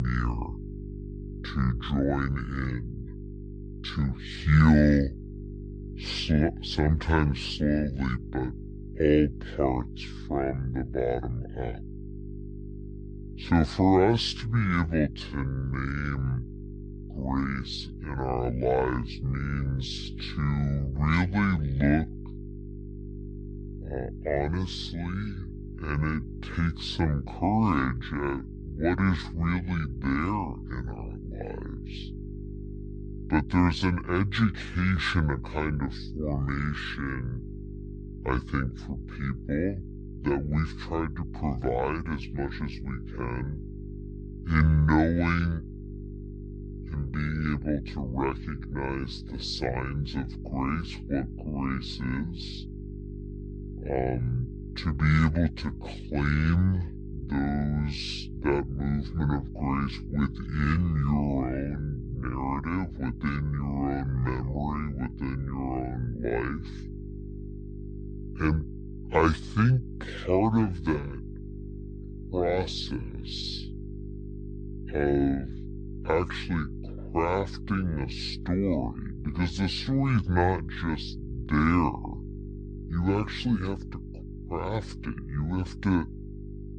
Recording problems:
wrong speed and pitch; too slow and too low; 0.6 times normal speed
electrical hum; noticeable; throughout; 50 Hz, 15 dB below the speech
abrupt cut into speech; at the start

